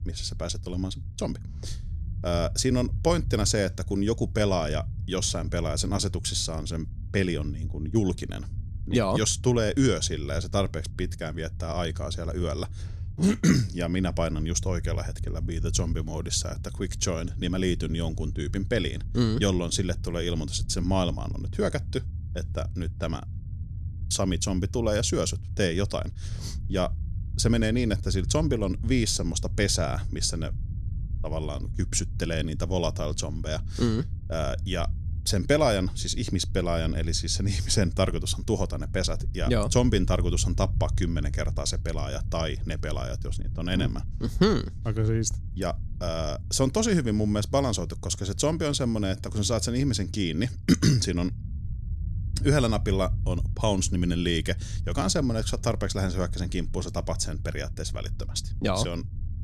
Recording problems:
low rumble; faint; throughout; 20 dB below the speech

